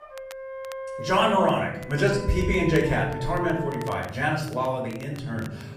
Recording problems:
off-mic speech; far
room echo; noticeable; dies away in 0.7 s
background music; noticeable; throughout; 10 dB below the speech
crackle, like an old record; faint; 25 dB below the speech

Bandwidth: 15 kHz